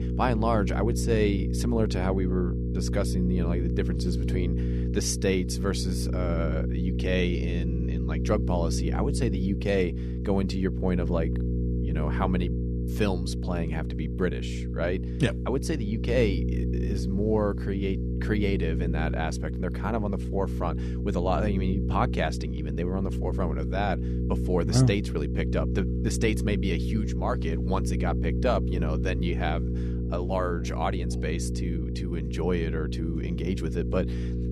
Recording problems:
electrical hum; loud; throughout; 60 Hz, 7 dB below the speech

